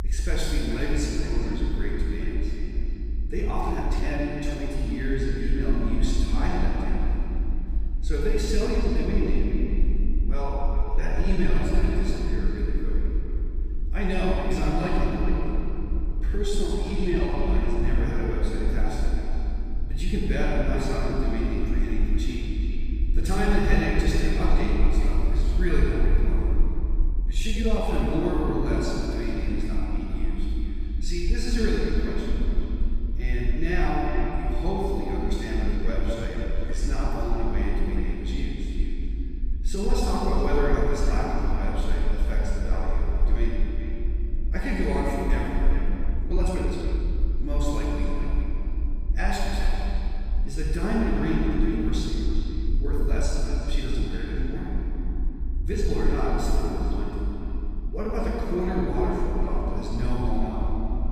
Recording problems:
room echo; strong; dies away in 3 s
off-mic speech; far
echo of what is said; noticeable; throughout; 410 ms later, 10 dB below the speech
low rumble; faint; throughout; 20 dB below the speech
uneven, jittery; strongly; from 3.5 to 58 s

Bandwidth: 15 kHz